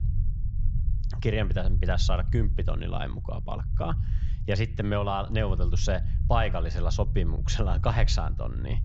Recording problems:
high frequencies cut off; noticeable; nothing above 7.5 kHz
low rumble; noticeable; throughout; 15 dB below the speech

